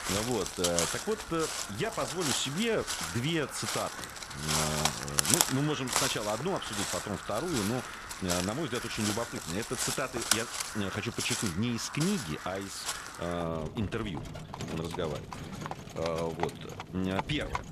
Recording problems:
animal sounds; very loud; throughout; as loud as the speech

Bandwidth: 14 kHz